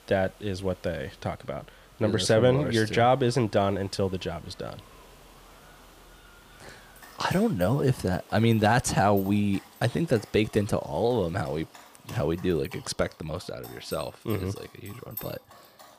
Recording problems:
animal sounds; faint; throughout; 20 dB below the speech
hiss; faint; until 13 s; 30 dB below the speech

